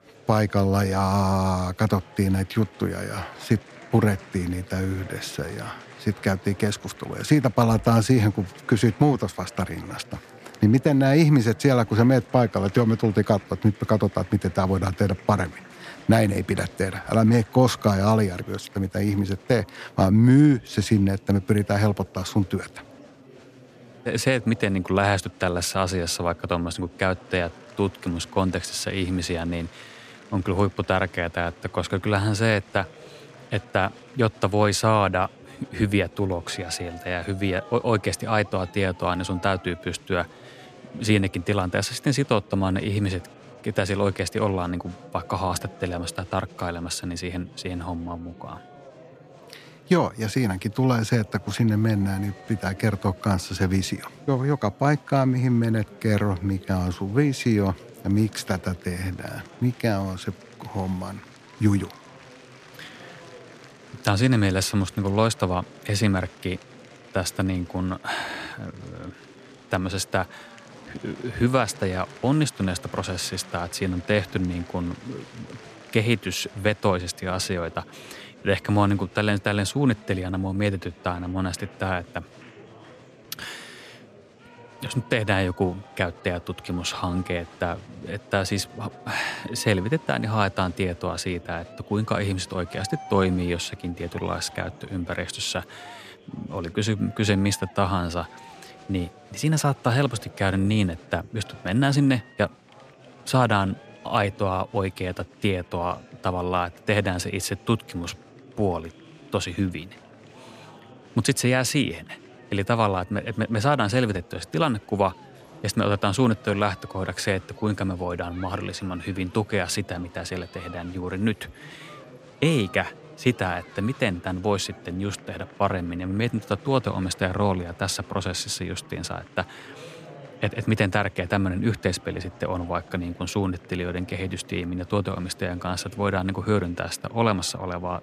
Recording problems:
murmuring crowd; faint; throughout; 20 dB below the speech

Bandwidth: 14 kHz